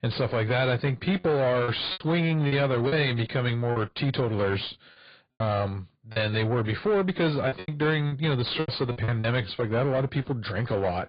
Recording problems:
garbled, watery; badly
high frequencies cut off; severe; nothing above 4.5 kHz
distortion; slight; 10 dB below the speech
choppy; very; 7% of the speech affected

